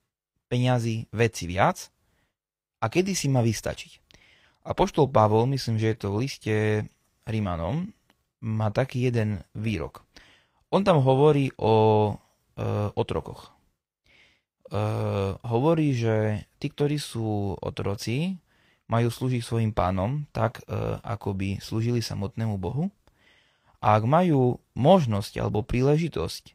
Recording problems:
none

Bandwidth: 15.5 kHz